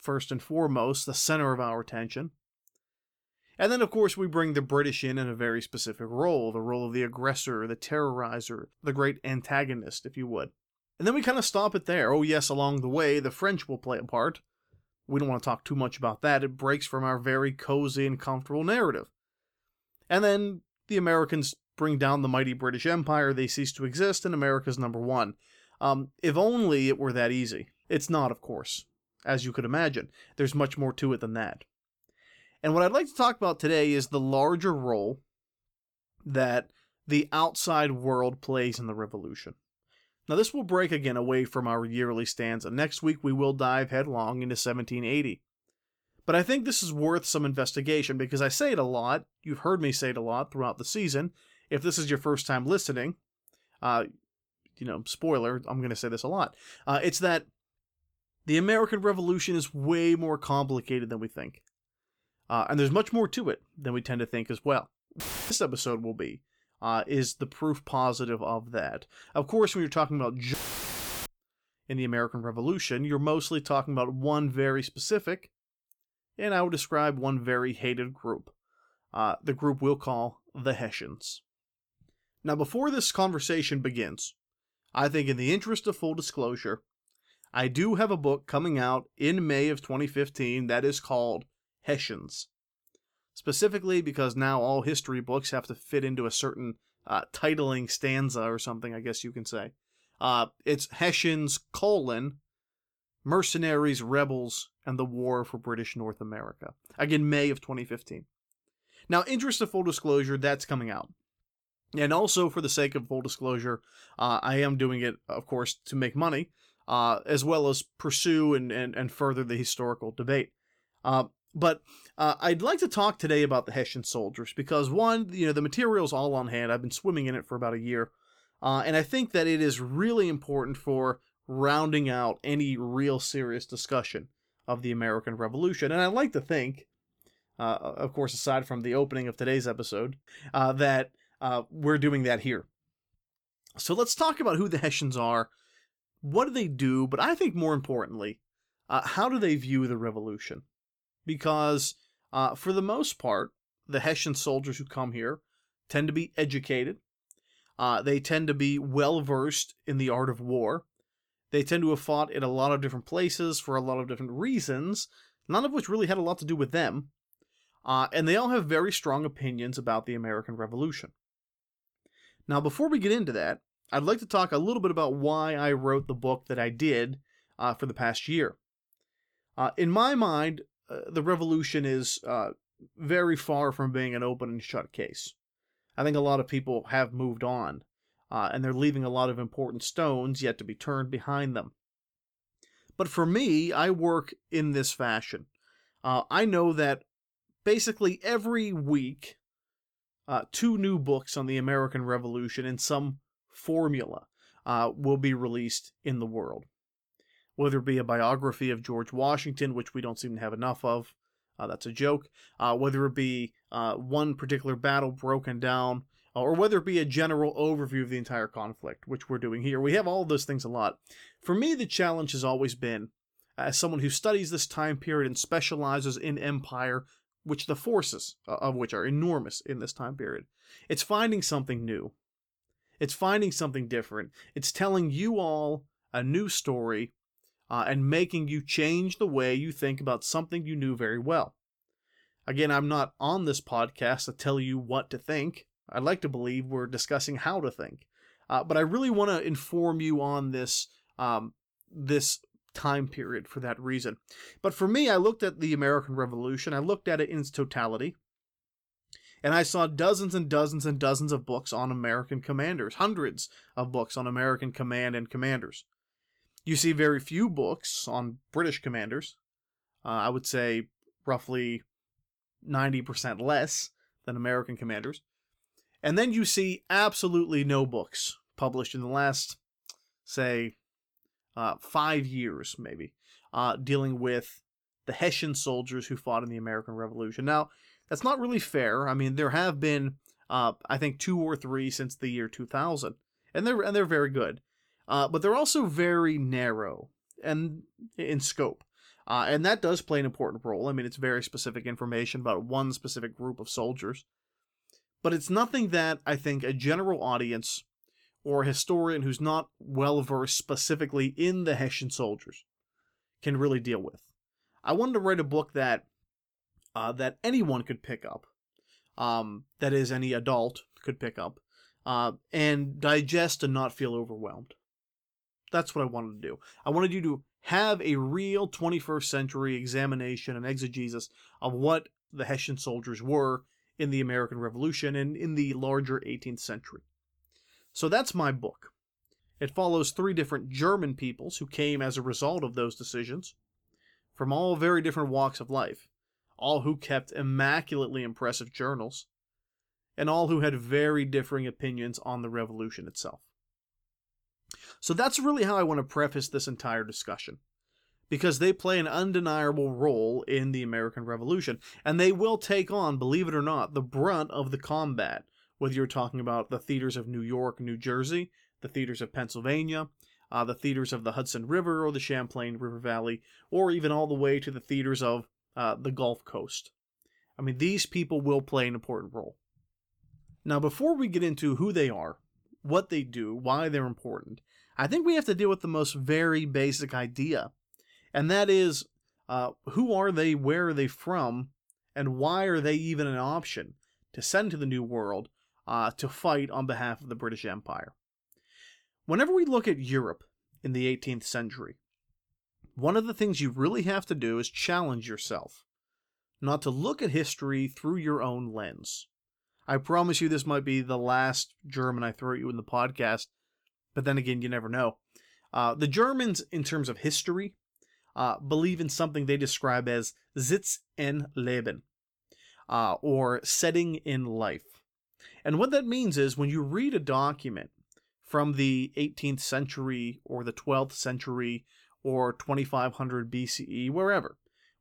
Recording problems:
audio cutting out; filled with static; at 1:05 and at 1:11 for 0.5 s

